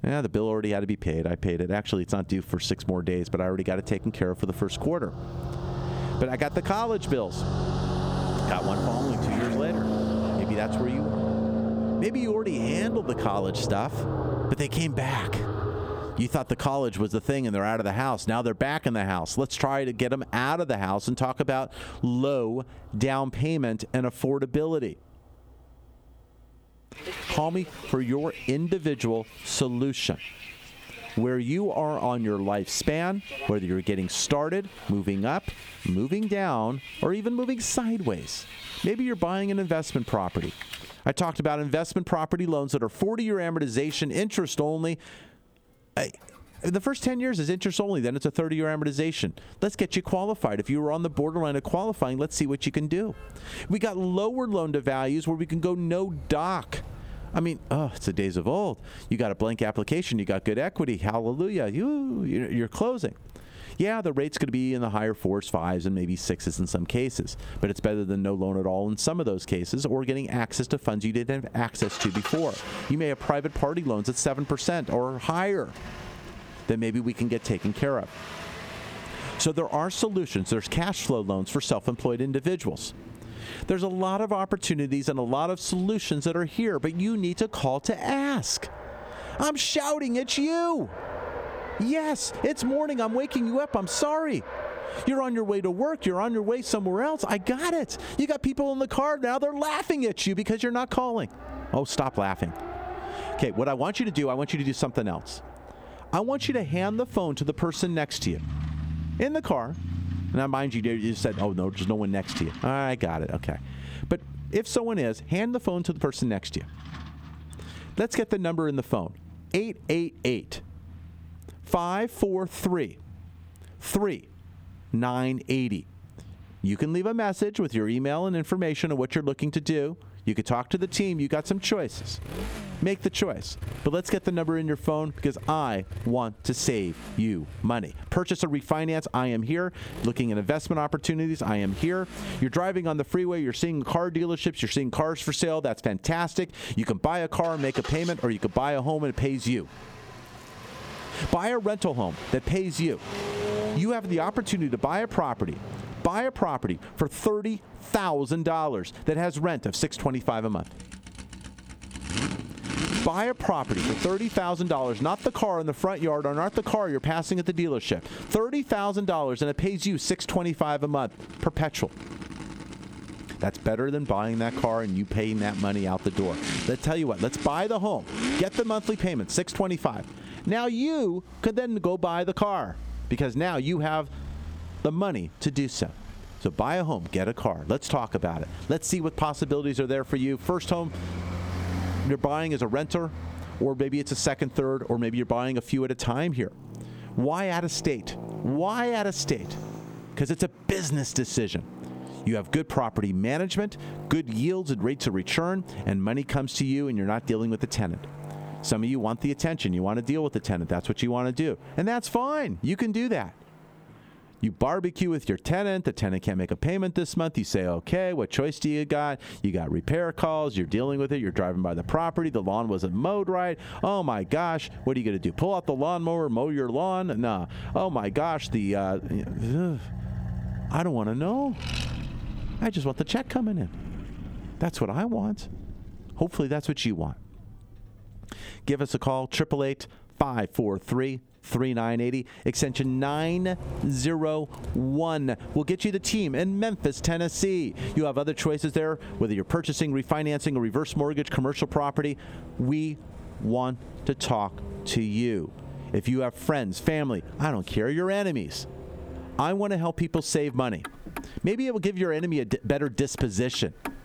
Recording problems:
squashed, flat; somewhat, background pumping
traffic noise; noticeable; throughout; 10 dB below the speech

